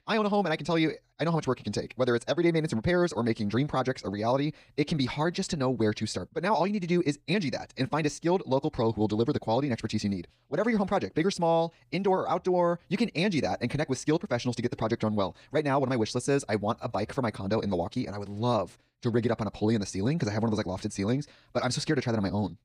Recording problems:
wrong speed, natural pitch; too fast; 1.5 times normal speed

